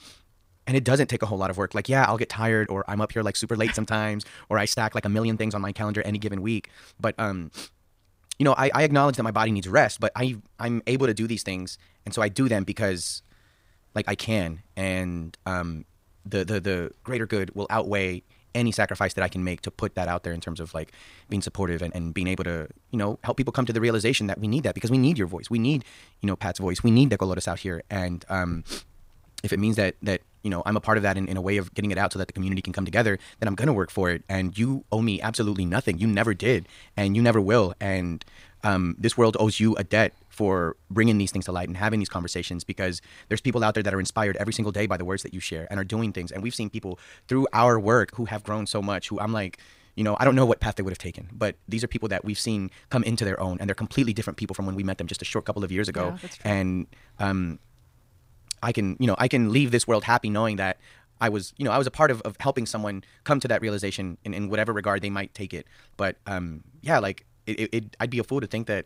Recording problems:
wrong speed, natural pitch; too fast; 1.5 times normal speed

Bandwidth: 15.5 kHz